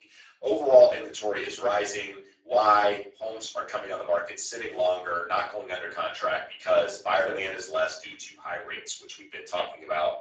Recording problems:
off-mic speech; far
garbled, watery; badly; nothing above 7.5 kHz
thin; very; fading below 350 Hz
room echo; slight; dies away in 0.3 s

